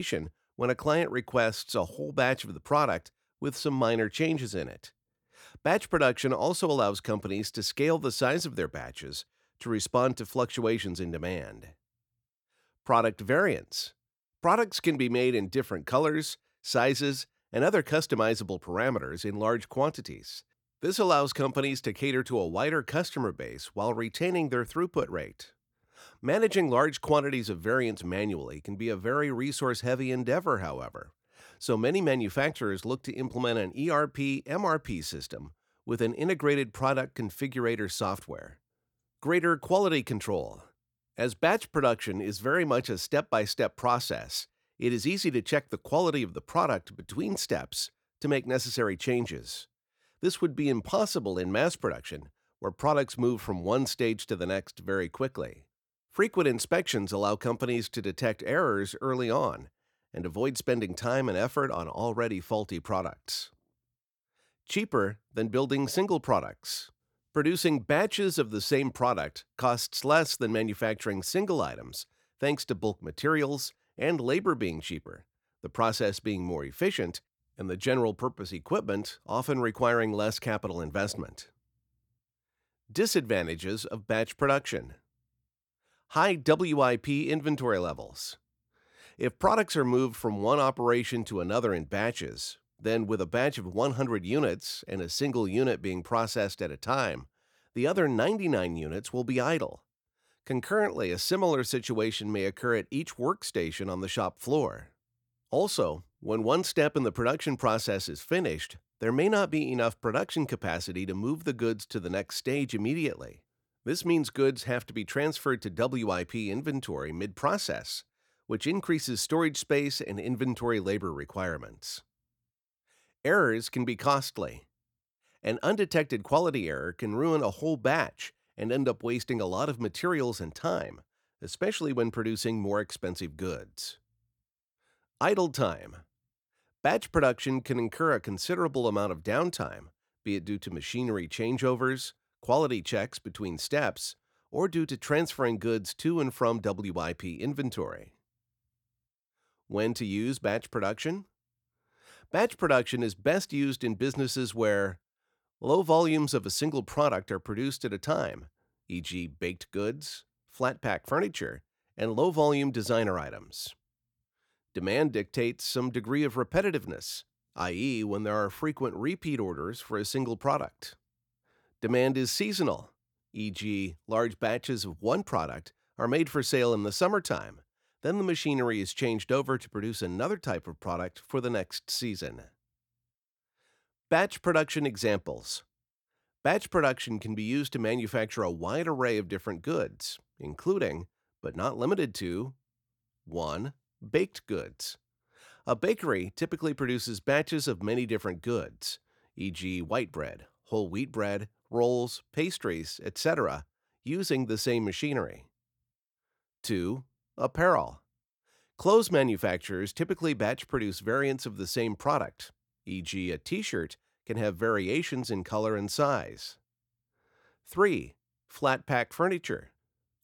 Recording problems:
abrupt cut into speech; at the start

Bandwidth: 18.5 kHz